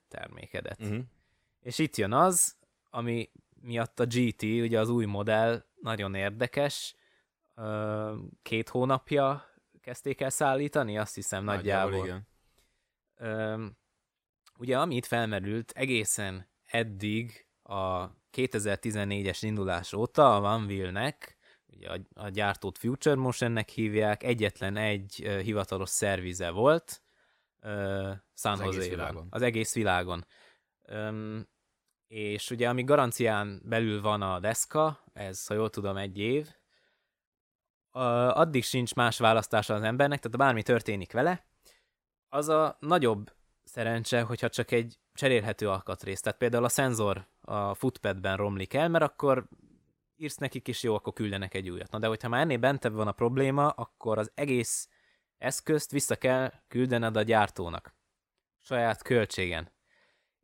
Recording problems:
uneven, jittery; strongly; from 5.5 to 59 s

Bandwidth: 16 kHz